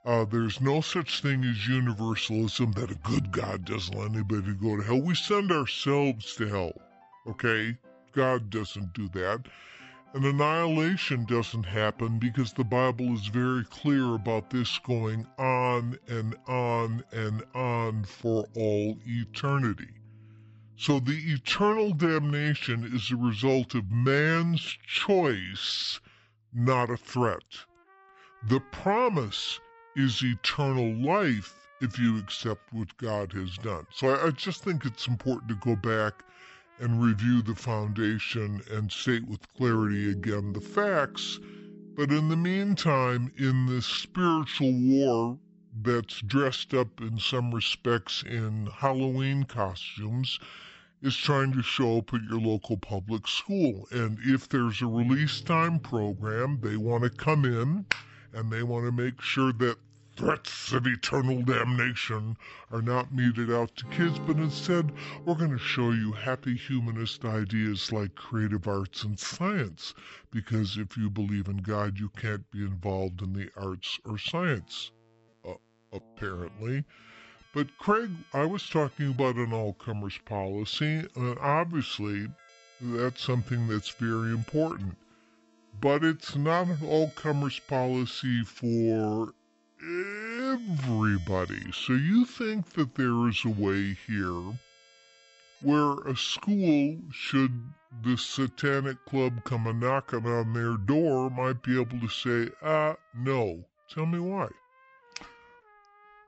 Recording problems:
wrong speed and pitch; too slow and too low; 0.7 times normal speed
background music; faint; throughout; 25 dB below the speech

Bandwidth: 8 kHz